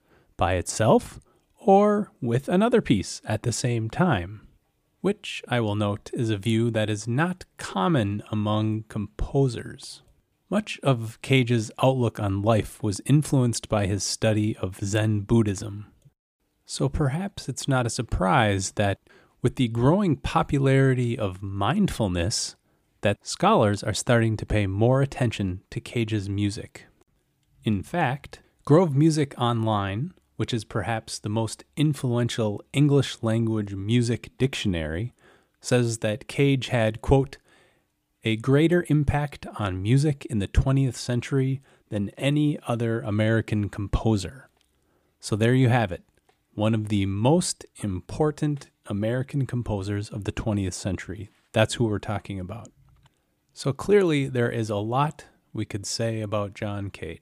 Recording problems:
none

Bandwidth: 15 kHz